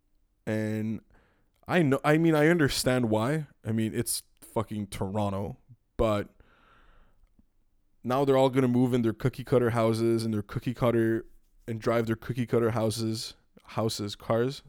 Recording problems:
none

